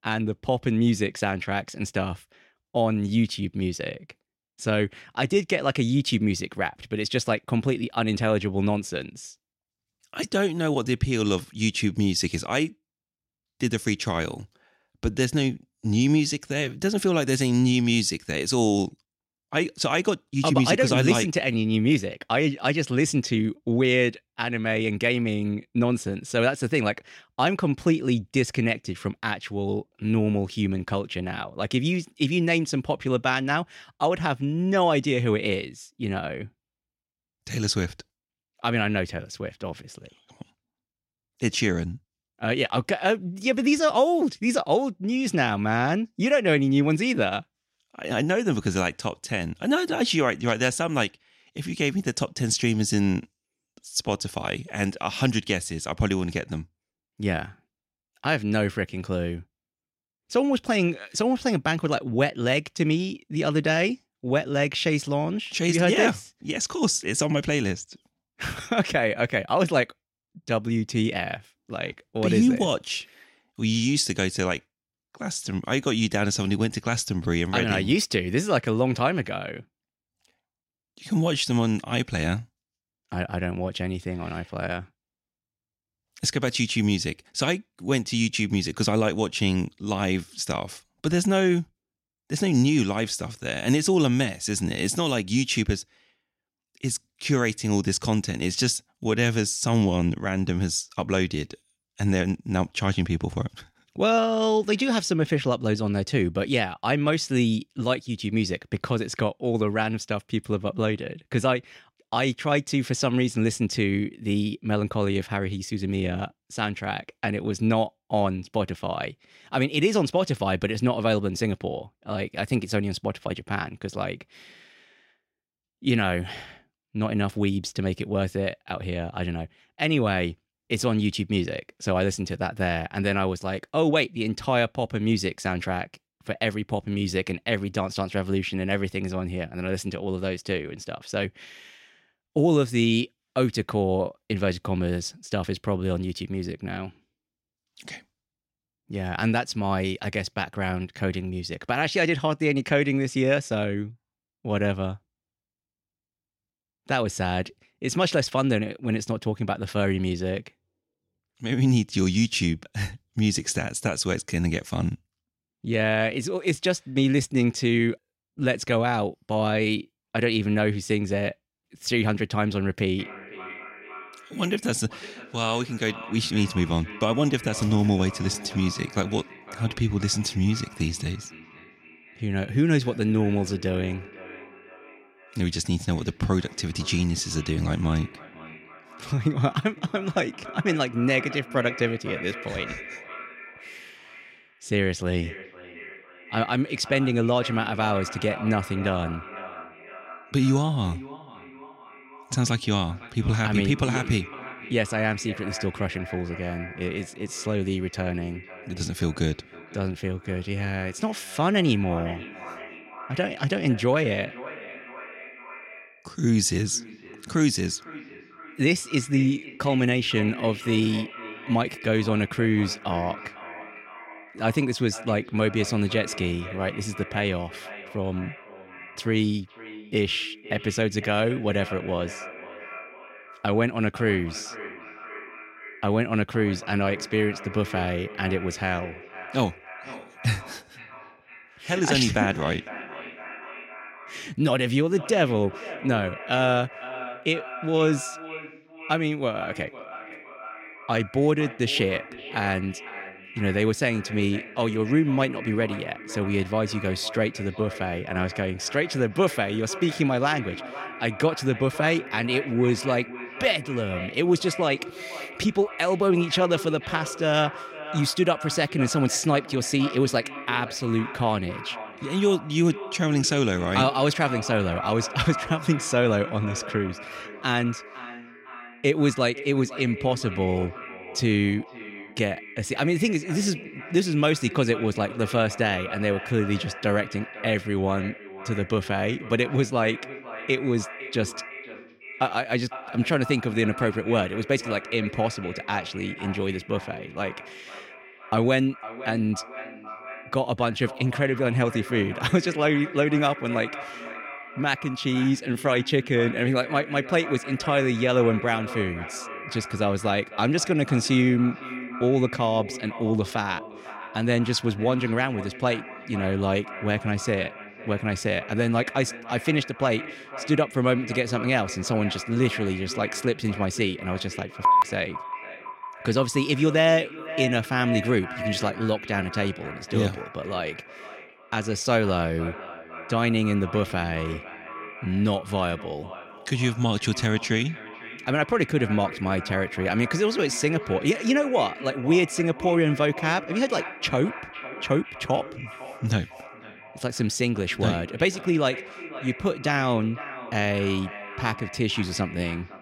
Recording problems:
echo of what is said; noticeable; from 2:53 on; 500 ms later, 15 dB below the speech

